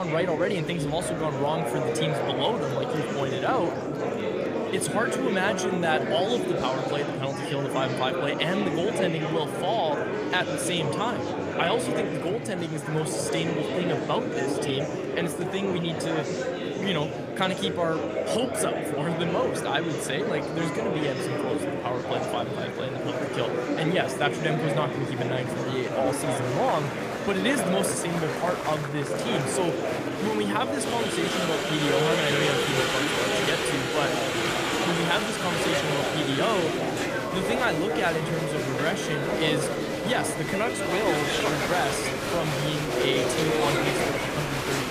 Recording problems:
murmuring crowd; very loud; throughout; 1 dB above the speech
abrupt cut into speech; at the start

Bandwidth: 15 kHz